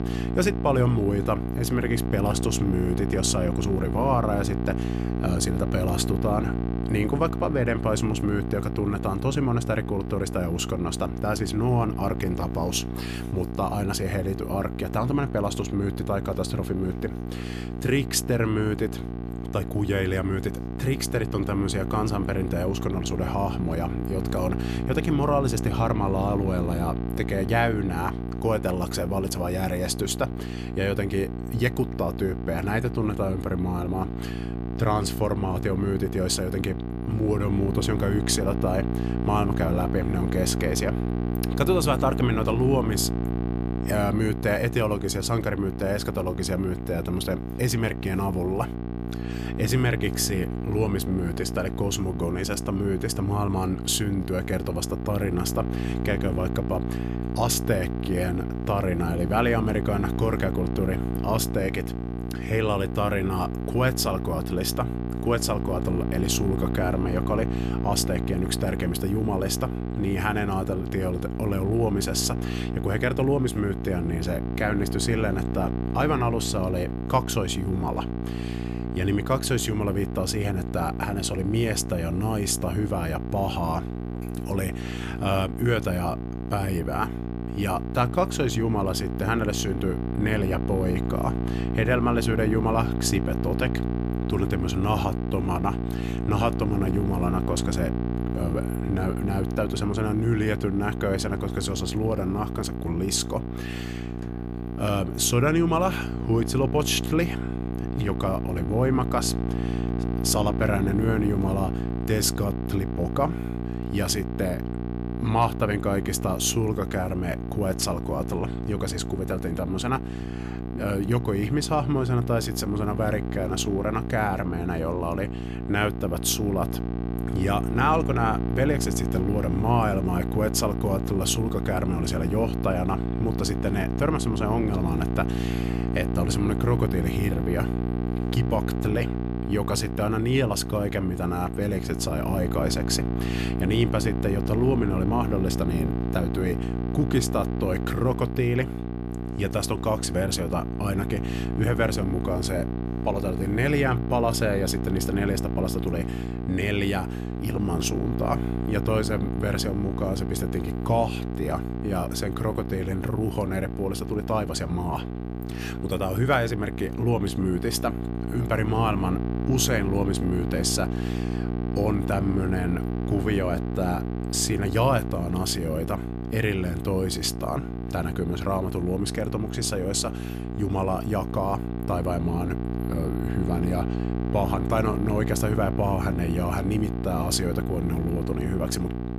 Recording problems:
electrical hum; loud; throughout; 60 Hz, 7 dB below the speech

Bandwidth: 14.5 kHz